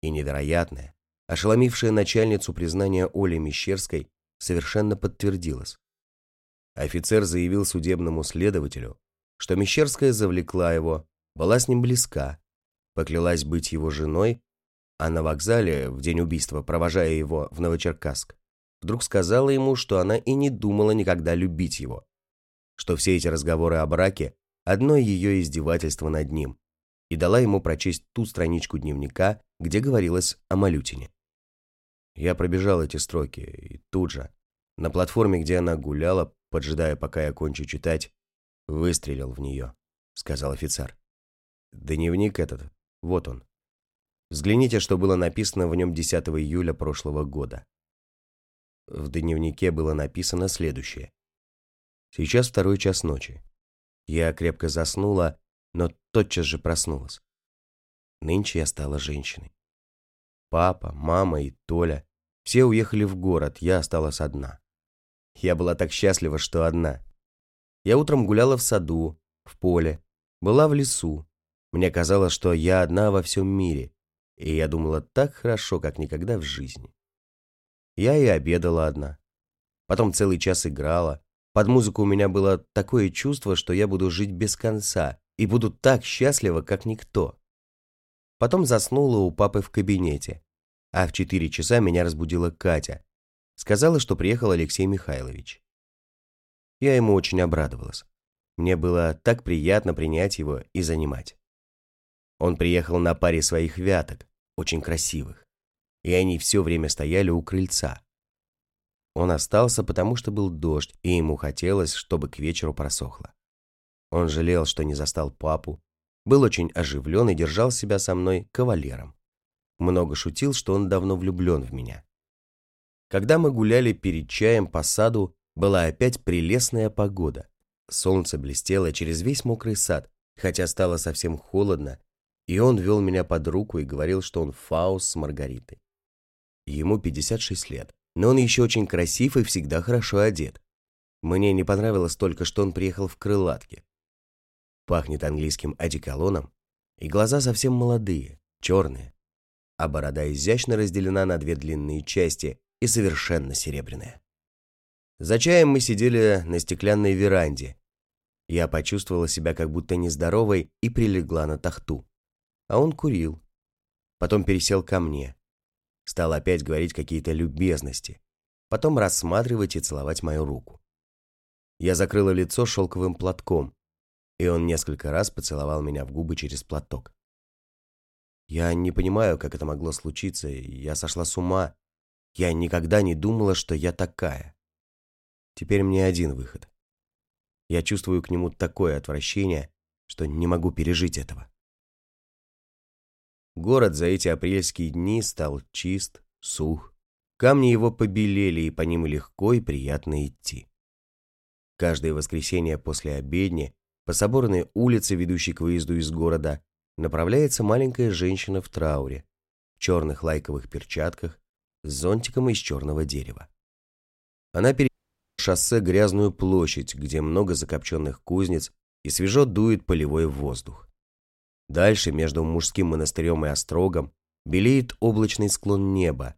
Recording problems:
audio cutting out; at 3:35 for 0.5 s

